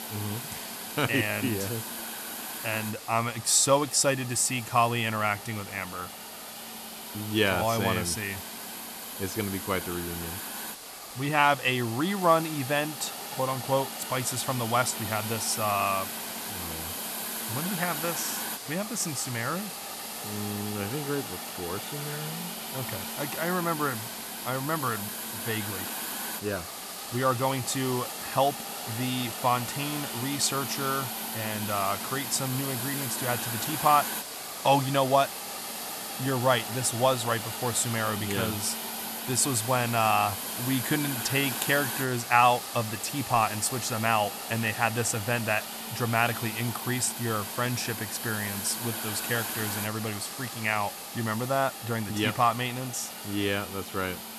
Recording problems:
hiss; loud; throughout; 6 dB below the speech

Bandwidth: 13.5 kHz